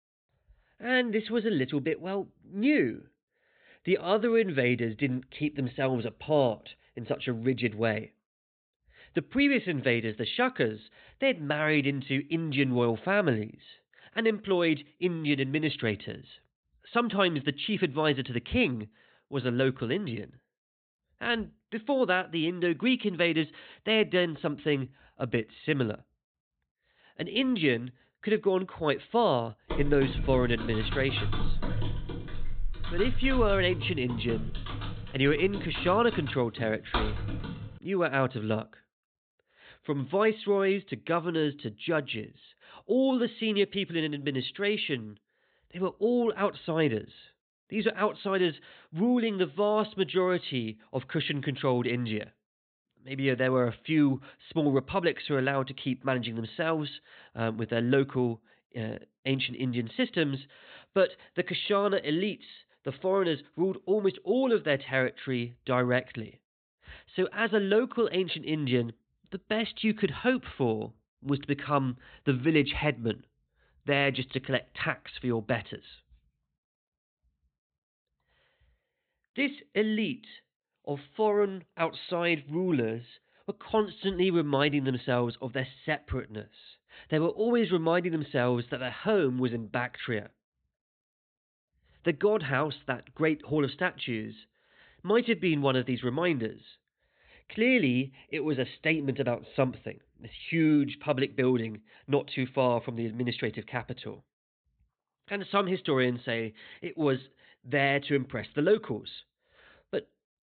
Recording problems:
high frequencies cut off; severe; nothing above 4 kHz
keyboard typing; noticeable; from 30 to 38 s; peak 3 dB below the speech

